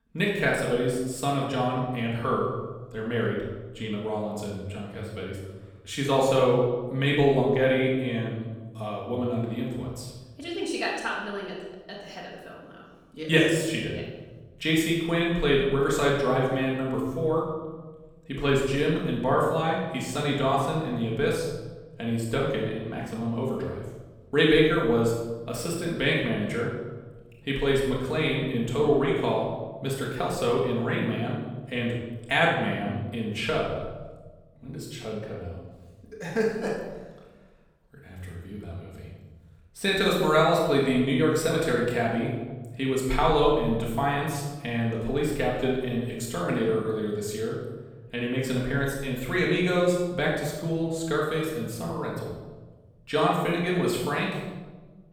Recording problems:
off-mic speech; far
room echo; noticeable; dies away in 1.1 s

